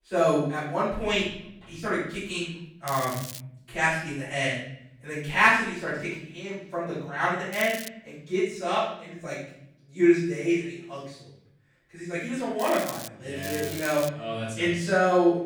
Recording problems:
off-mic speech; far
room echo; noticeable; dies away in 0.8 s
crackling; noticeable; 4 times, first at 3 s; 10 dB below the speech

